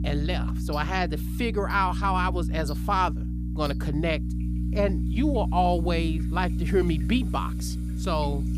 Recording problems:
electrical hum; noticeable; throughout; 60 Hz, 15 dB below the speech
household noises; faint; throughout; 25 dB below the speech

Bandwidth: 14.5 kHz